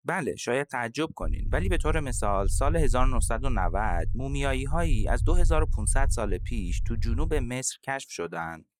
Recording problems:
low rumble; faint; from 1 to 7.5 s; 20 dB below the speech

